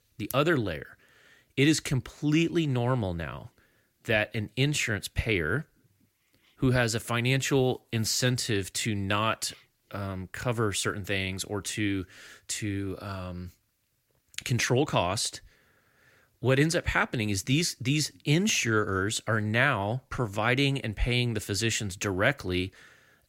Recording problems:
none

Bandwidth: 16.5 kHz